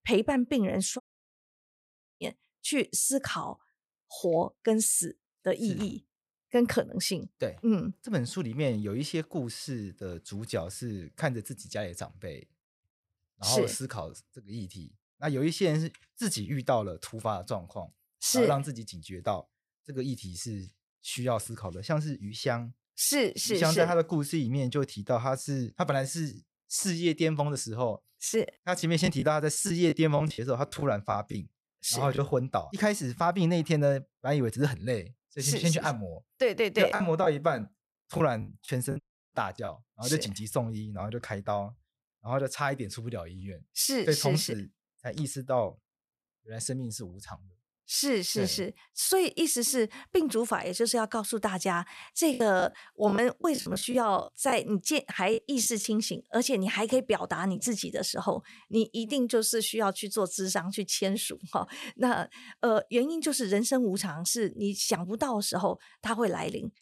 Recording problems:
audio cutting out; at 1 s for 1 s and at 39 s
choppy; very; from 29 to 32 s, from 37 to 40 s and from 52 to 56 s; 11% of the speech affected

